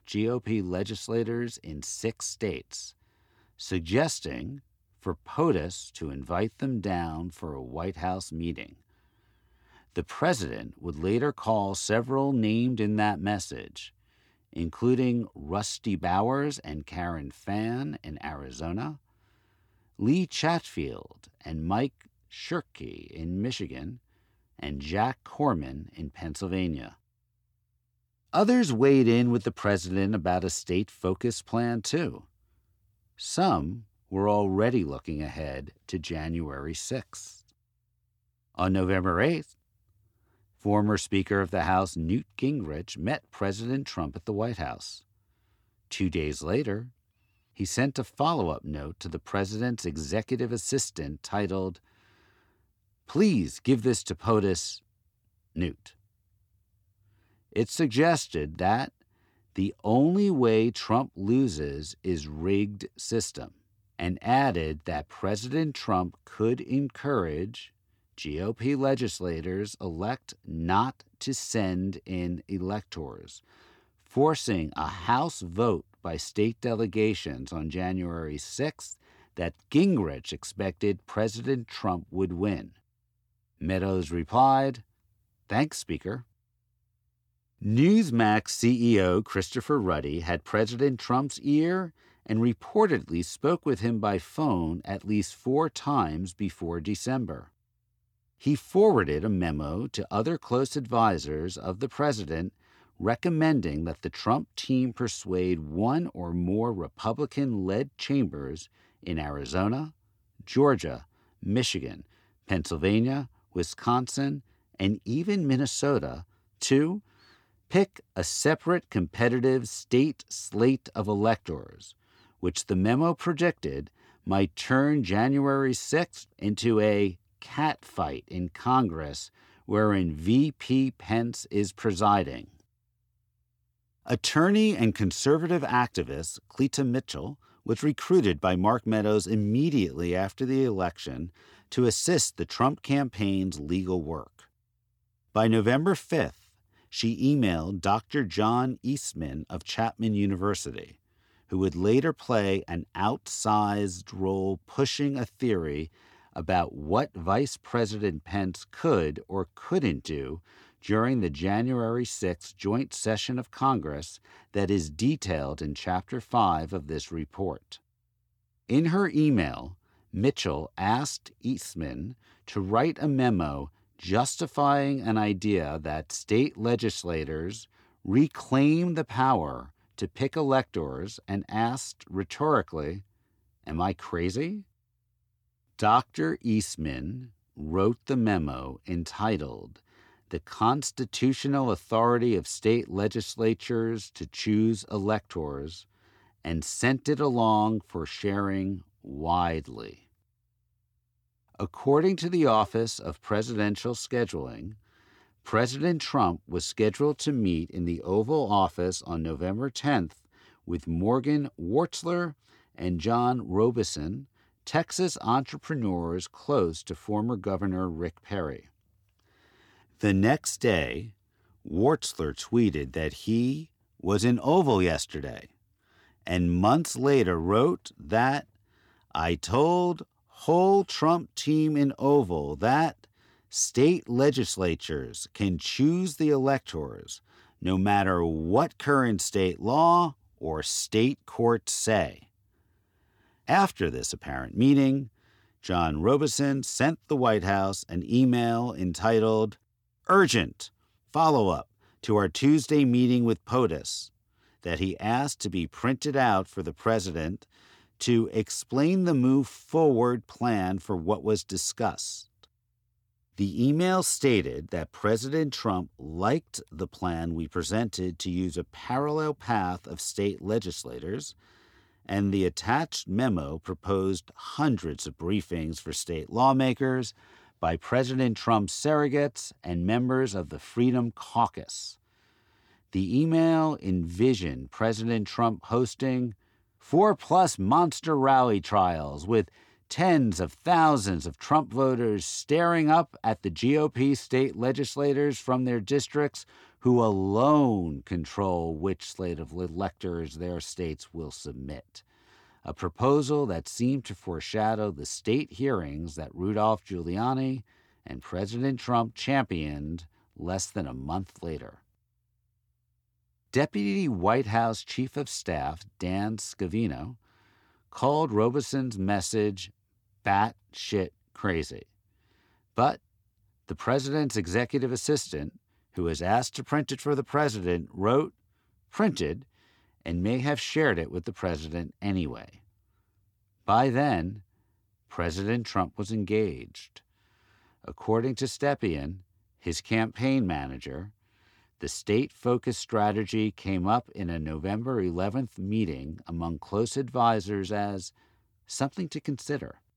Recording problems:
none

